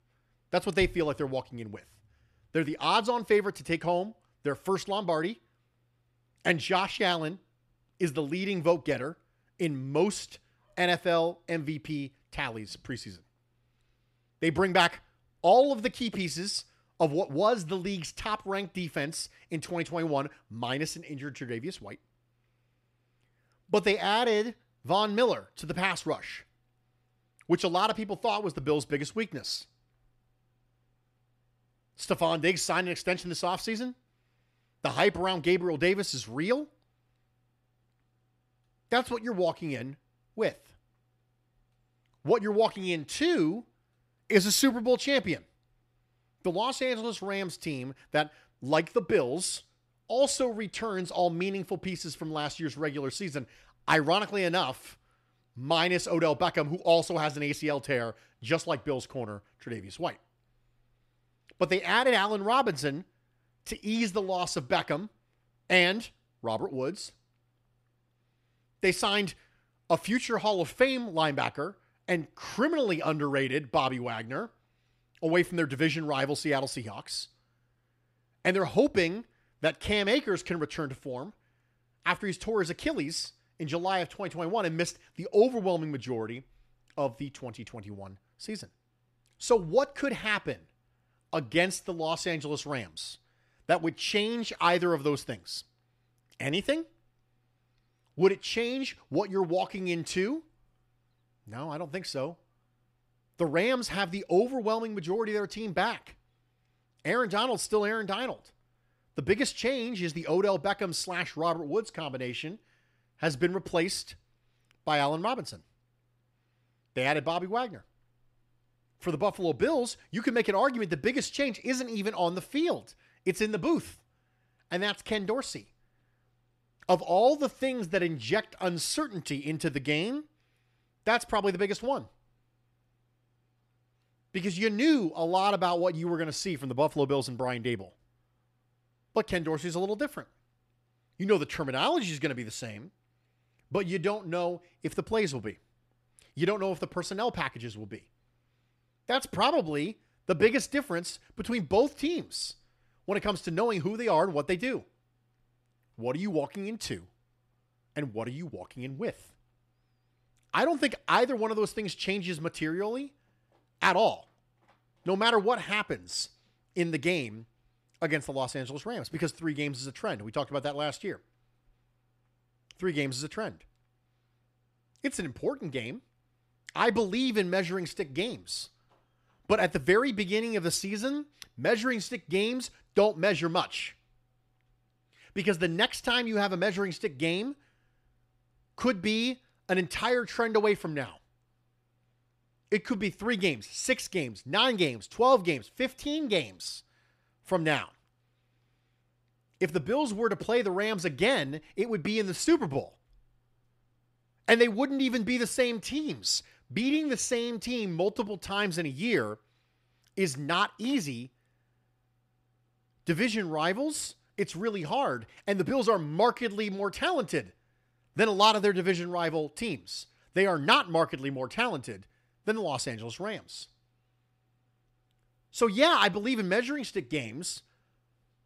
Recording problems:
none

